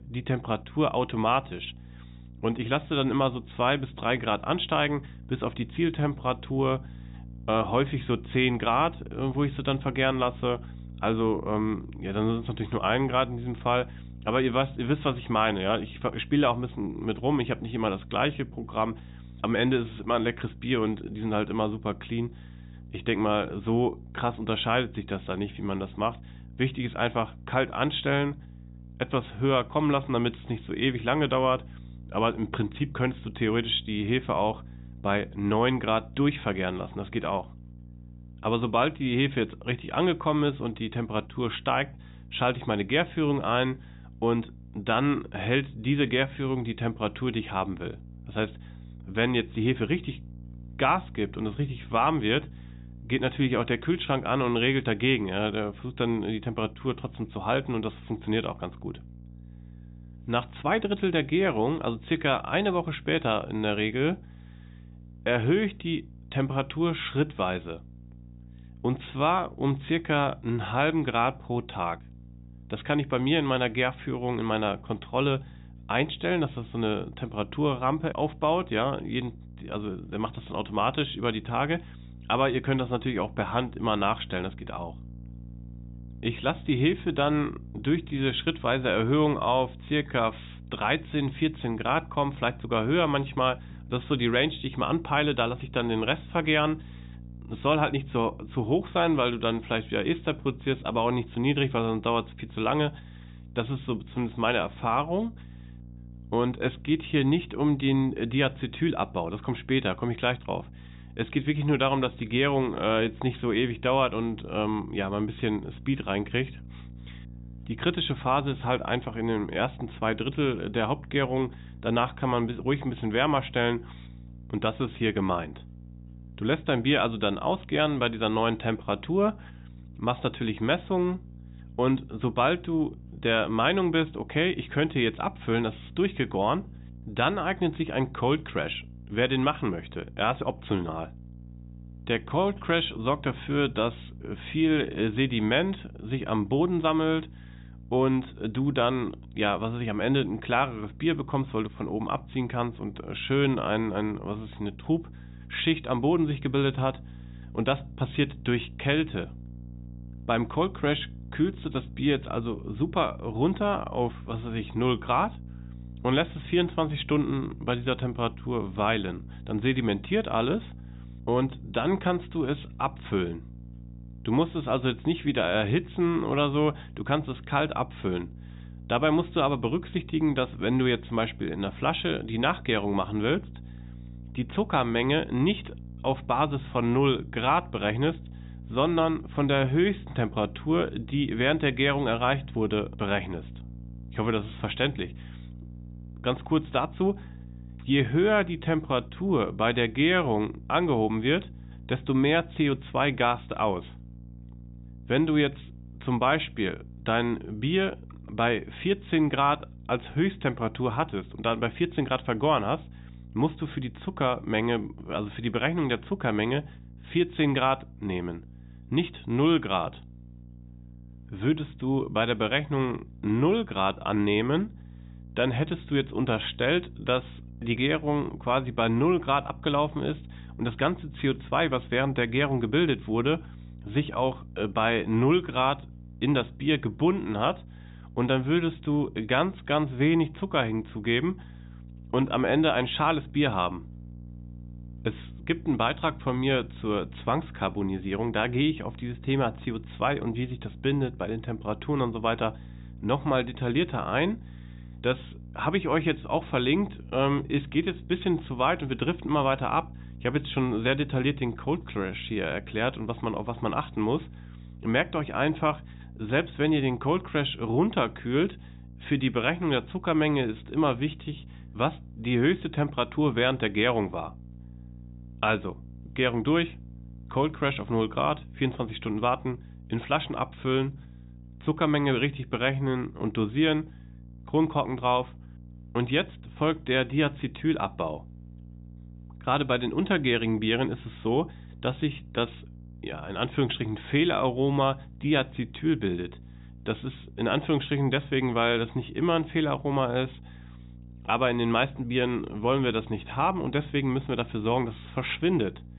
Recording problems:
high frequencies cut off; severe; nothing above 4 kHz
electrical hum; faint; throughout; 60 Hz, 30 dB below the speech

